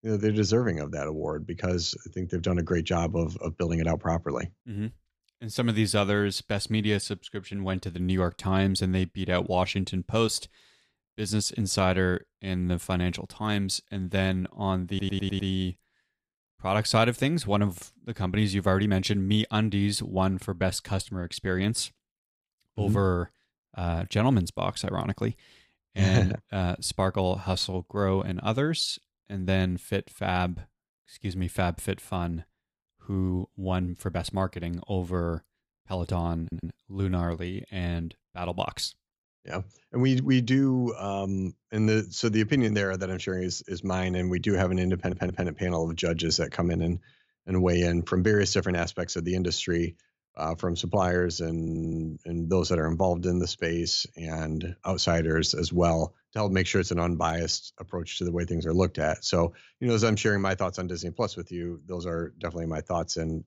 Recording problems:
audio stuttering; 4 times, first at 15 s

